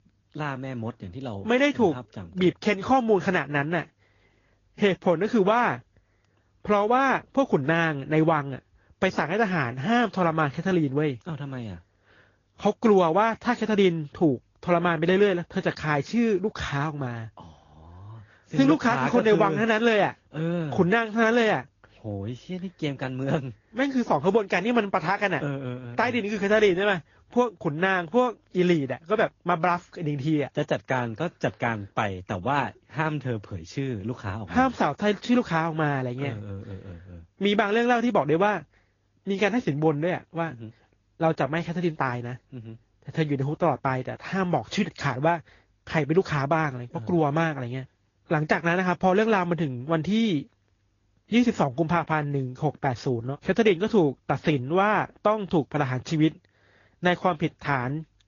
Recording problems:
high frequencies cut off; noticeable; nothing above 7 kHz
garbled, watery; slightly

